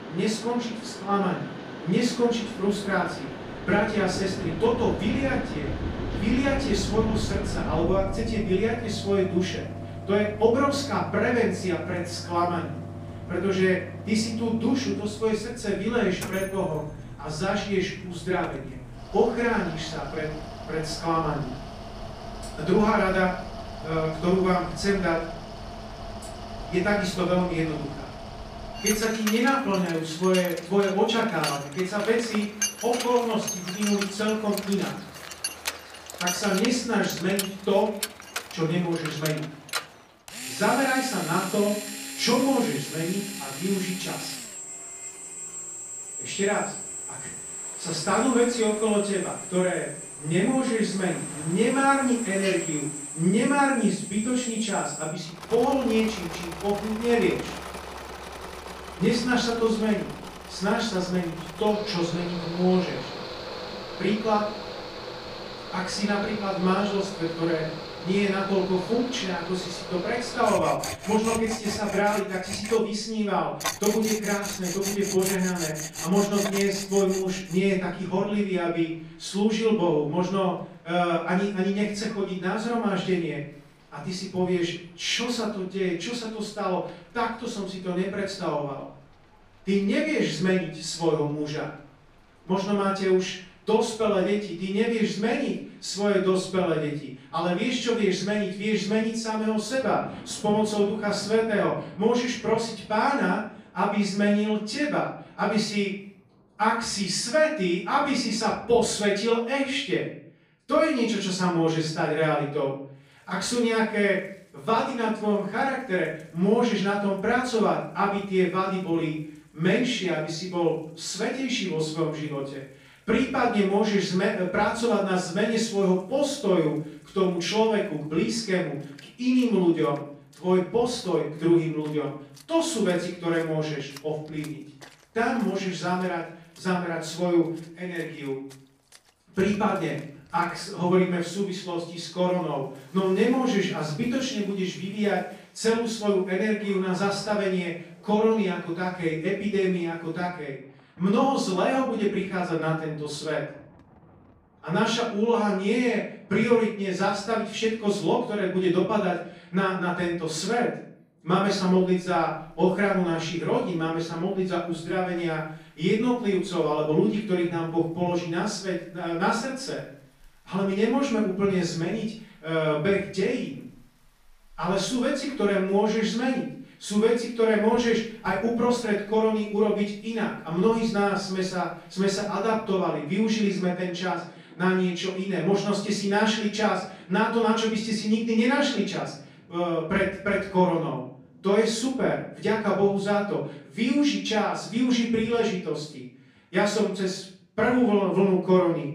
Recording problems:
off-mic speech; far
room echo; noticeable; dies away in 0.5 s
machinery noise; loud; until 1:17; 10 dB below the speech
rain or running water; noticeable; throughout; 20 dB below the speech

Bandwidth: 15 kHz